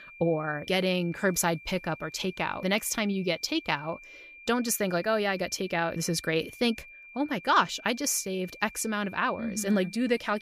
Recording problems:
high-pitched whine; noticeable; throughout; 2.5 kHz, 20 dB below the speech

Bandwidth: 15 kHz